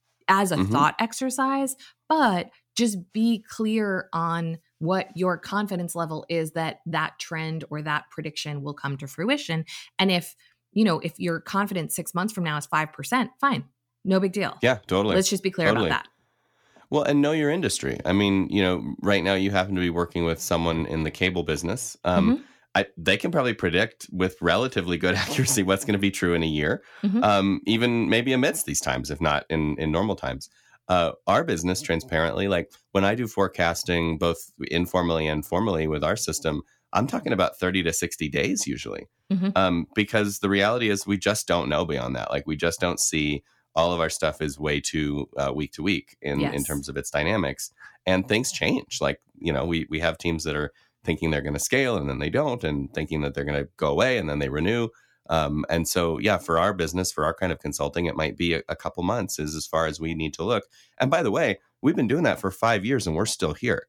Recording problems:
none

